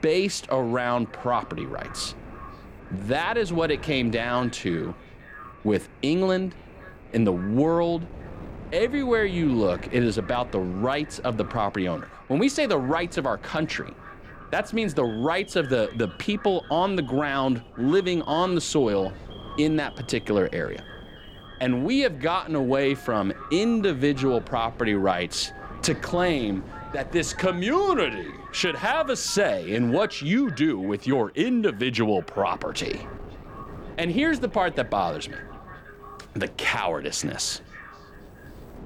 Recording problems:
echo of what is said; faint; throughout; 530 ms later, 20 dB below the speech
wind noise on the microphone; occasional gusts; 25 dB below the speech
alarms or sirens; faint; throughout; 25 dB below the speech

